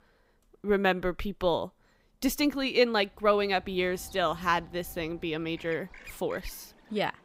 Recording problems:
animal sounds; faint; from 3.5 s on; 20 dB below the speech

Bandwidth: 15.5 kHz